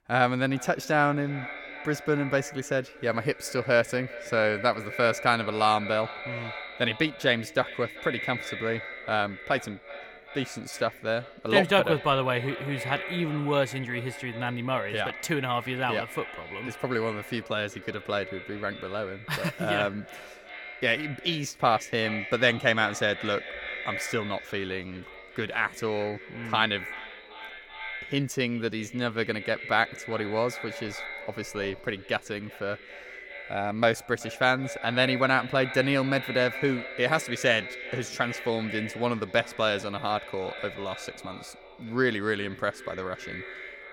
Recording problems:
echo of what is said; strong; throughout; 380 ms later, 10 dB below the speech

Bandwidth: 17 kHz